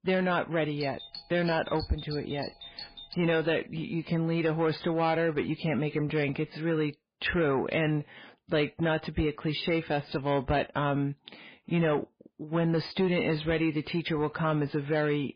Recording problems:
garbled, watery; badly
distortion; slight; 10 dB below the speech
doorbell; faint; from 1 to 3.5 s; peak 10 dB below the speech

